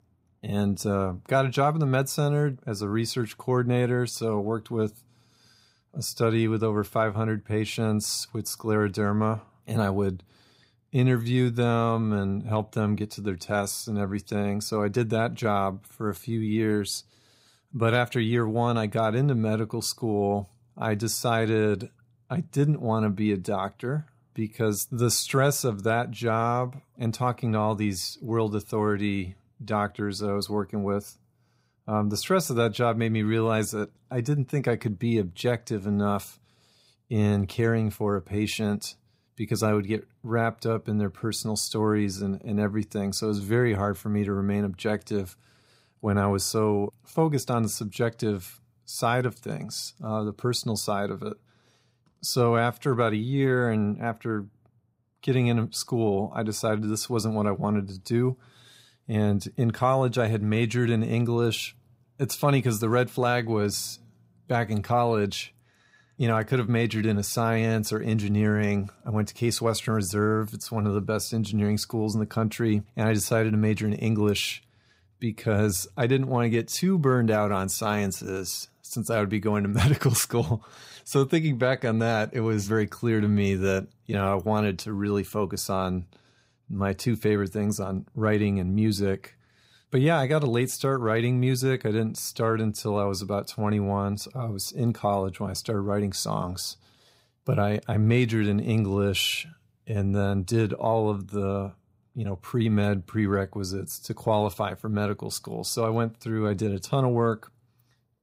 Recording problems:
none

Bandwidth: 15.5 kHz